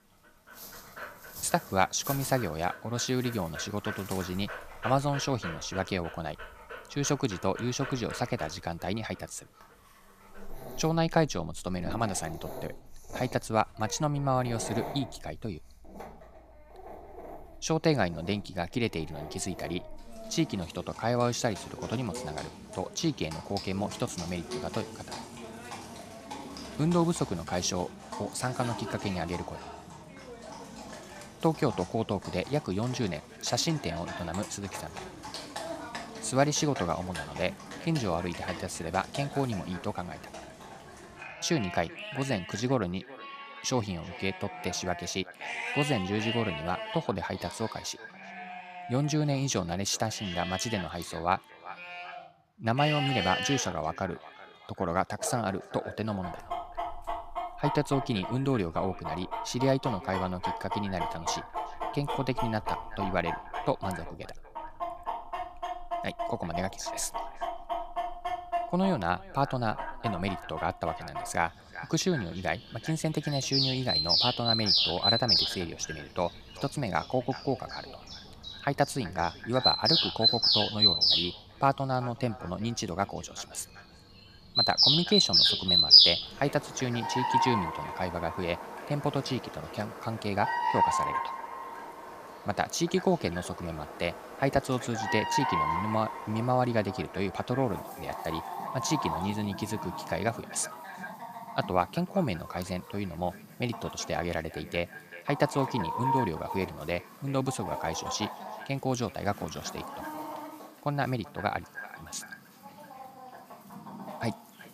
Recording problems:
echo of what is said; noticeable; from 33 s on; 380 ms later, 15 dB below the speech
animal sounds; very loud; throughout; 1 dB above the speech

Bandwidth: 14.5 kHz